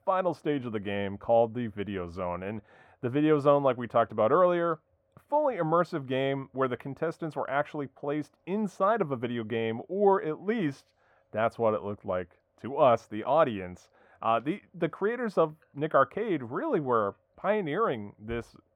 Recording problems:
muffled; very; fading above 3 kHz

